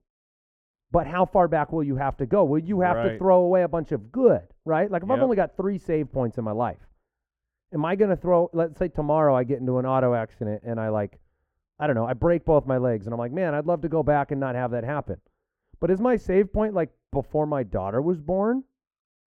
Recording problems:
muffled; very; fading above 2 kHz

